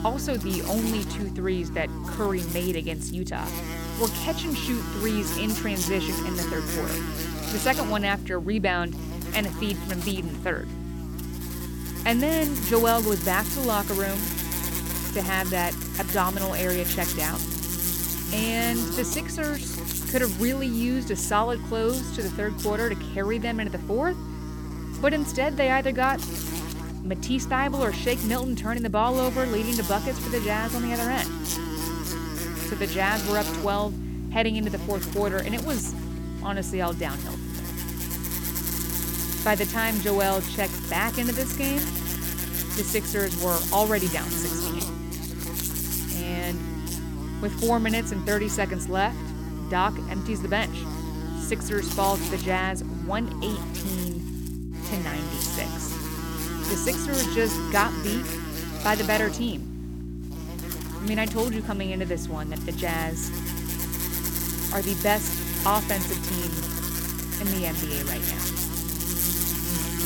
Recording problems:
electrical hum; loud; throughout; 60 Hz, 6 dB below the speech

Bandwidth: 17 kHz